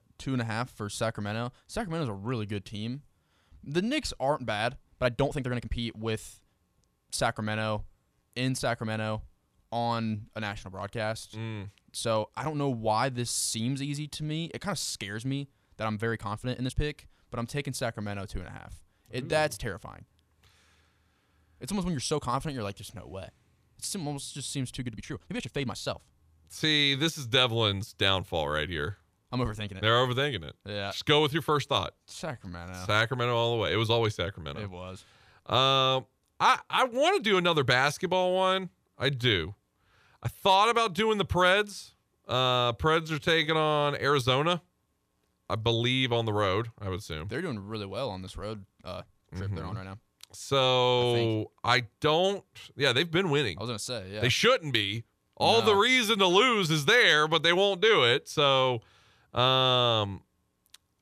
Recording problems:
uneven, jittery; strongly; from 3.5 s to 1:00

